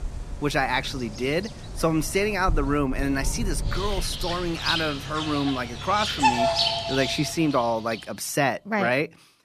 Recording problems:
animal sounds; loud; until 7.5 s; 3 dB below the speech

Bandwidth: 14 kHz